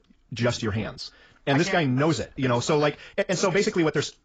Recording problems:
garbled, watery; badly; nothing above 7.5 kHz
wrong speed, natural pitch; too fast; 1.6 times normal speed

